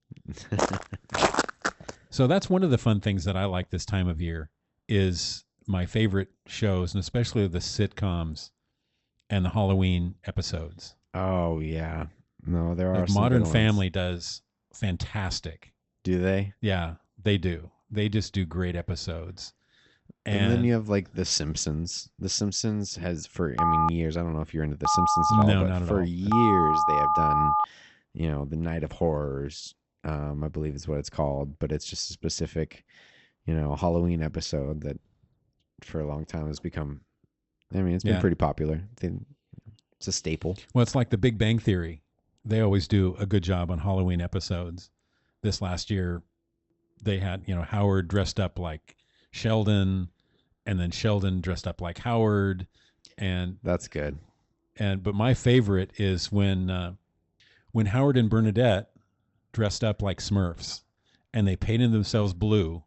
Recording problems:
high frequencies cut off; noticeable; nothing above 7.5 kHz
footsteps; loud; from 0.5 to 2 s; peak 3 dB above the speech
phone ringing; loud; from 24 to 28 s; peak 5 dB above the speech

